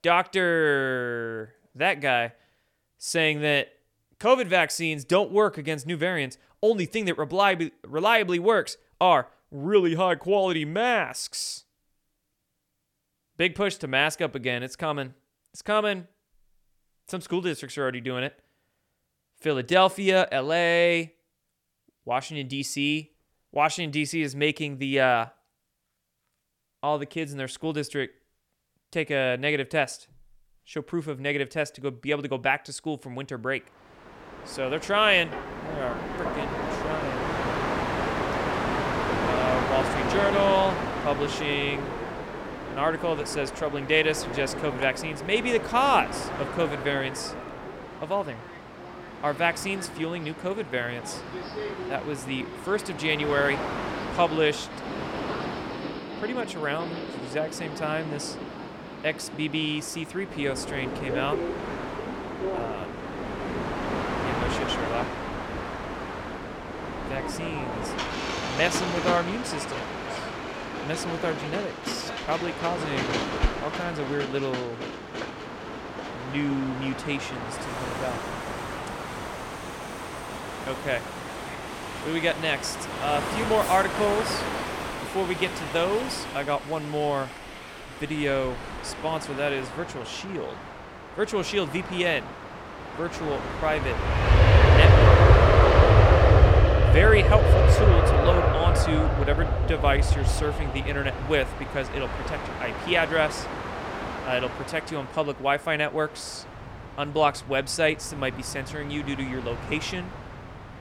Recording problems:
train or aircraft noise; loud; from 34 s on; as loud as the speech

